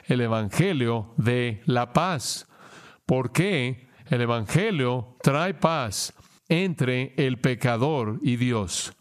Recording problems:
squashed, flat; heavily

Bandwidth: 14.5 kHz